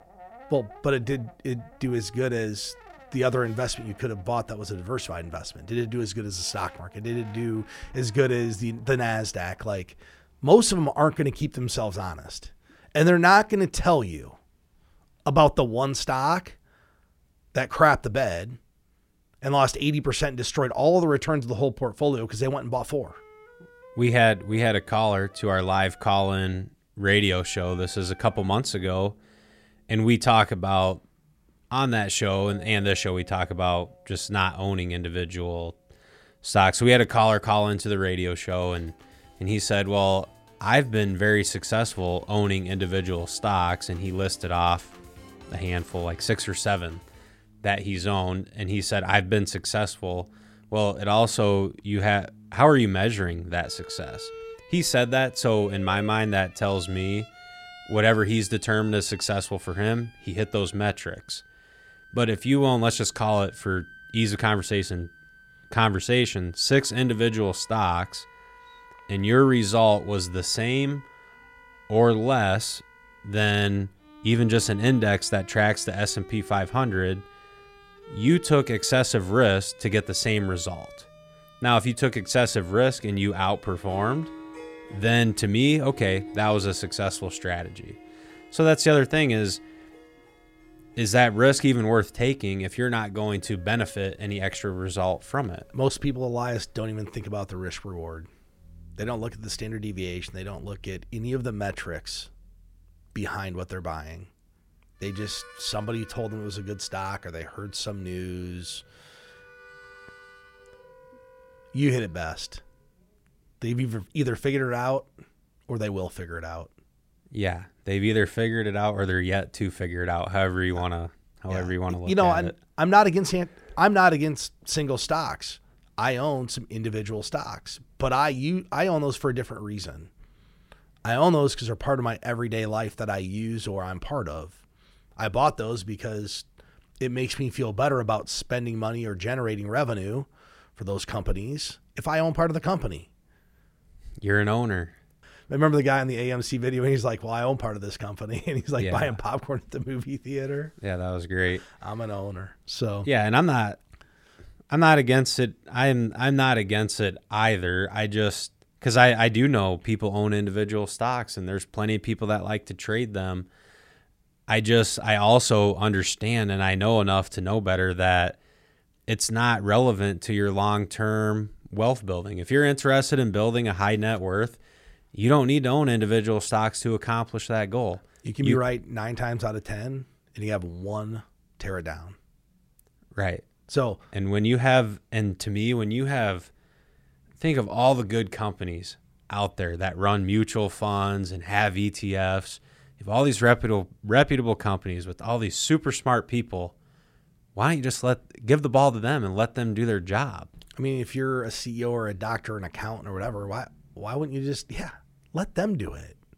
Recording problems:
background music; faint; until 1:52; 25 dB below the speech

